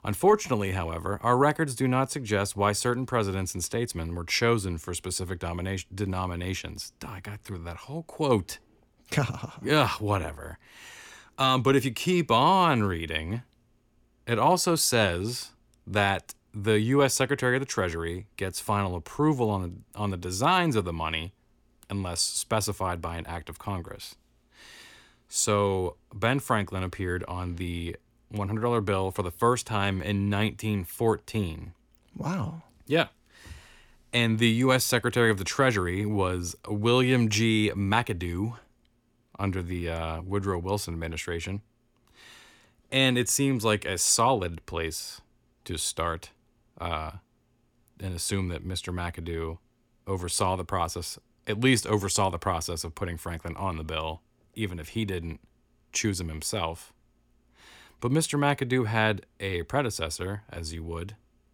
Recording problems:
none

